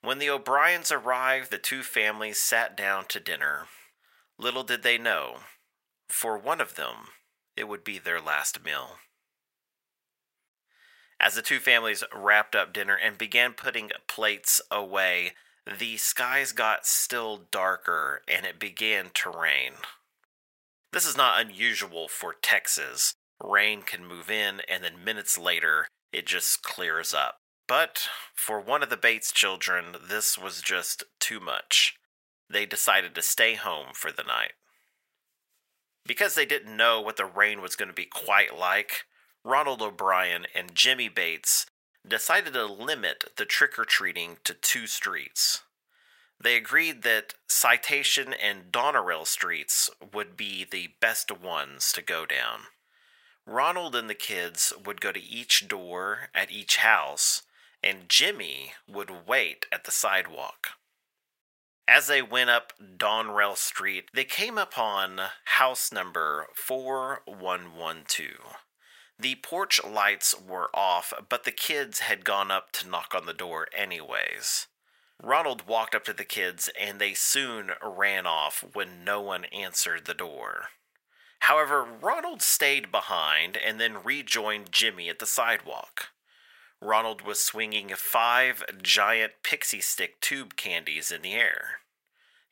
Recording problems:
thin; very; fading below 850 Hz

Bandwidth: 16 kHz